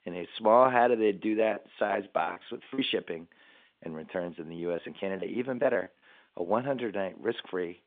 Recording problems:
phone-call audio
choppy; very; from 1 to 3 s and from 4 to 6 s; 15% of the speech affected

